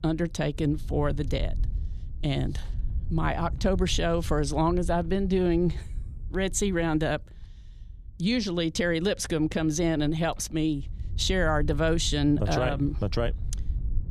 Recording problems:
low rumble; faint; throughout; 25 dB below the speech

